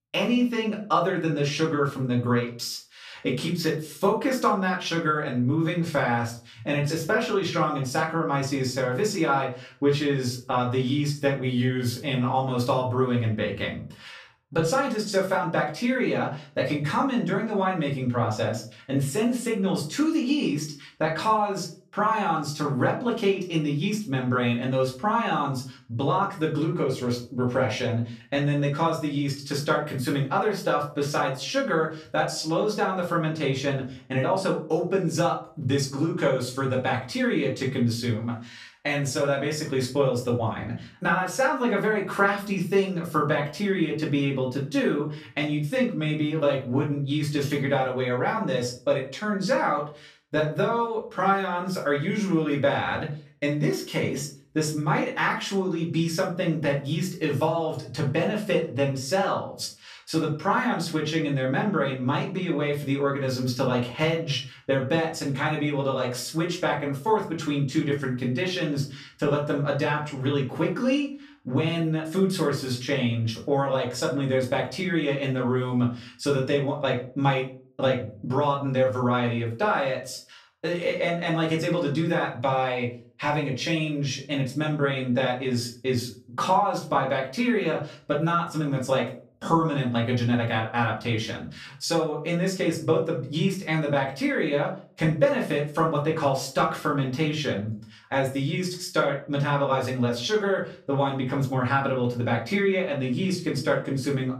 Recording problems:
off-mic speech; far
room echo; slight; dies away in 0.3 s

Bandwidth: 14.5 kHz